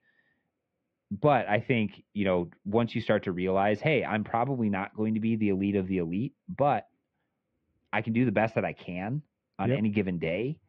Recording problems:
muffled; very; fading above 2.5 kHz

